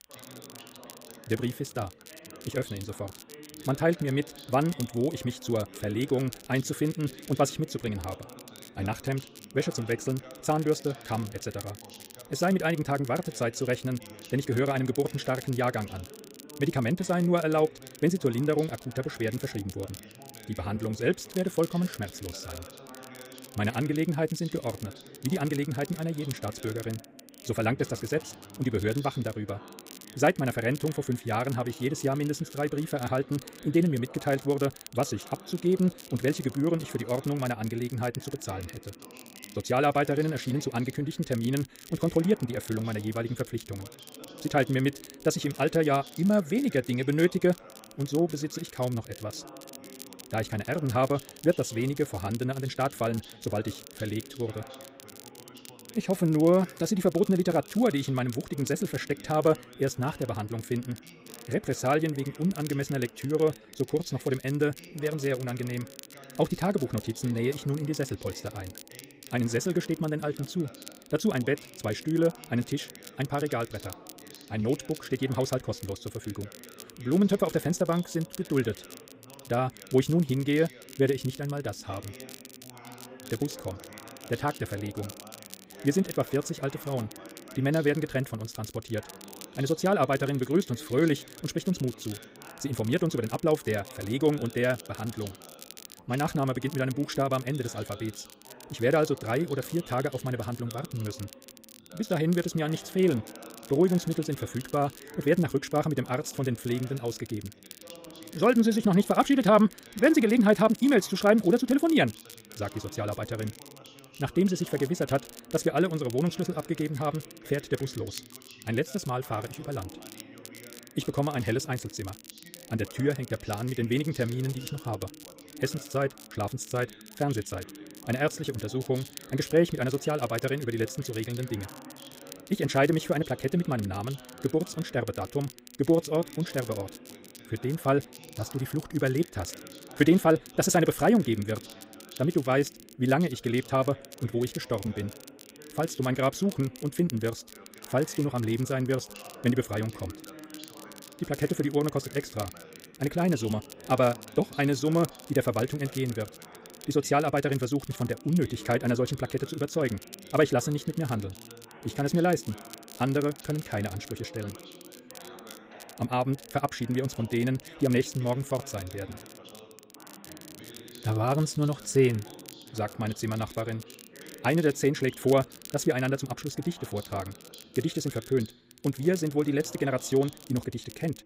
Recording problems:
wrong speed, natural pitch; too fast; 1.6 times normal speed
crackle, like an old record; noticeable; 20 dB below the speech
background chatter; faint; throughout; 2 voices, 20 dB below the speech

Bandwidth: 15.5 kHz